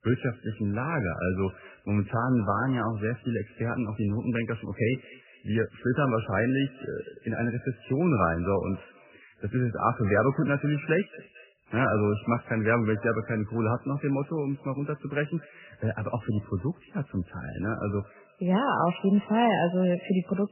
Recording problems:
garbled, watery; badly; nothing above 3 kHz
echo of what is said; faint; throughout; 220 ms later, 25 dB below the speech

